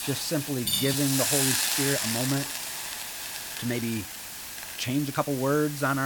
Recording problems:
hiss; loud; throughout; as loud as the speech
high-pitched whine; very faint; throughout; 5 kHz, 35 dB below the speech
uneven, jittery; strongly; from 0.5 to 5.5 s
clattering dishes; loud; at 0.5 s; peak 2 dB above the speech
abrupt cut into speech; at the end

